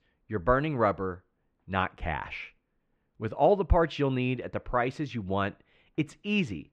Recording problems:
muffled; very; fading above 2.5 kHz

